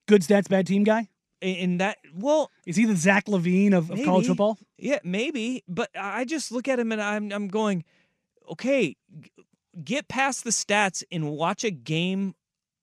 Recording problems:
none

